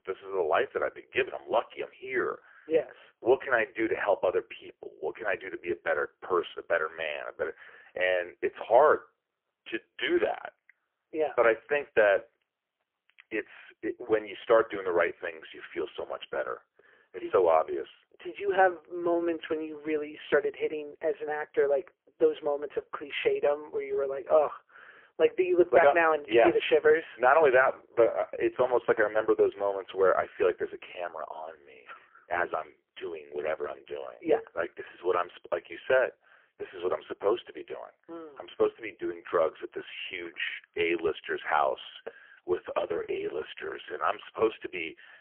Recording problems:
phone-call audio; poor line; nothing above 3 kHz

